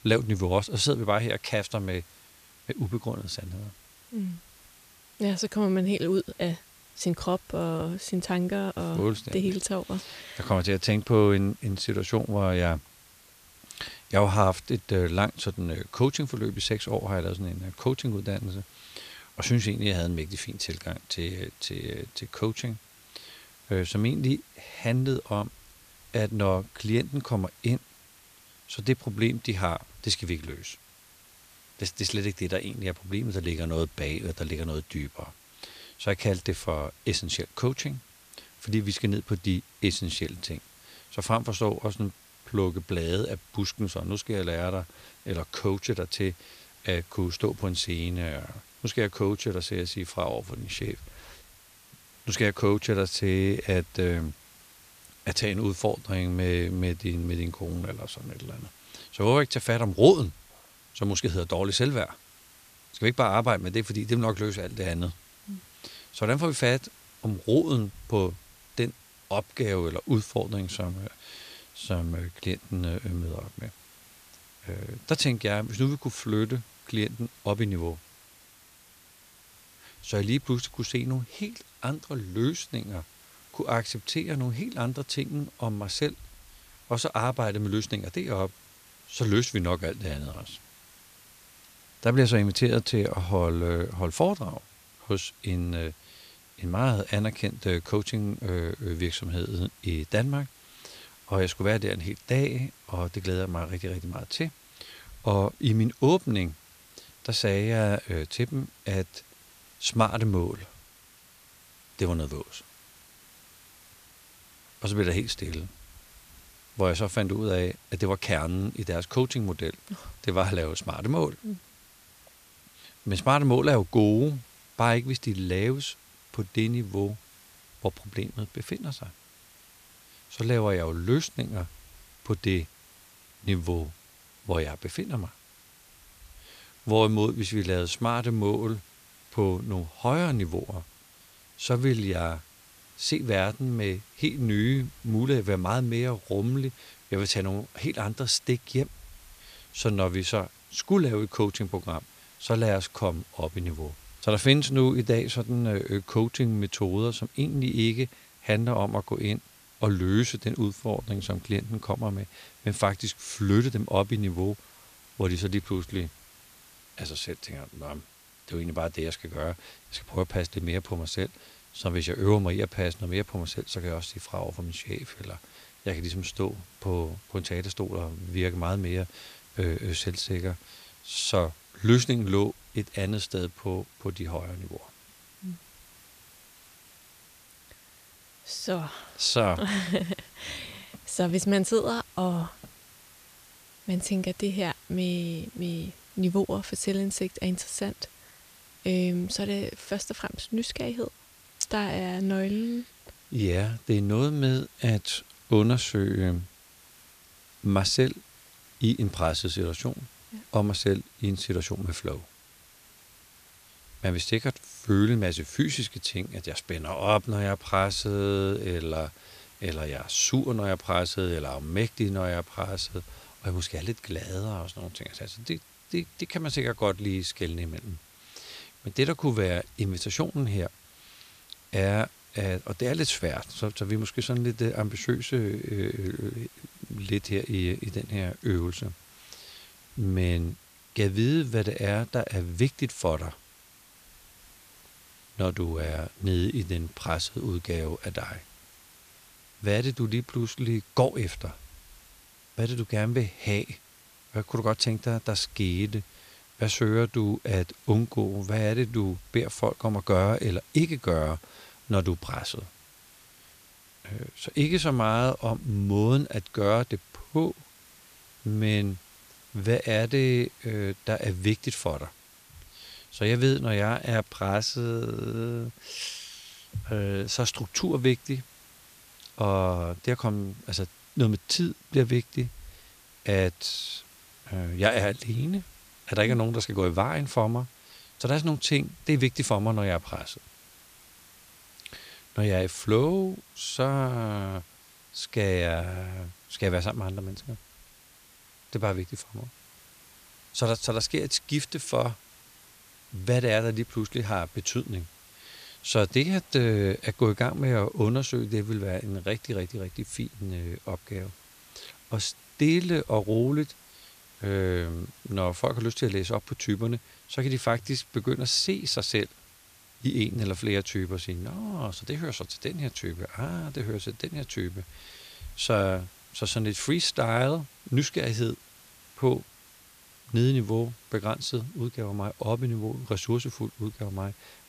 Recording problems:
hiss; faint; throughout; 25 dB below the speech

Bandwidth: 14.5 kHz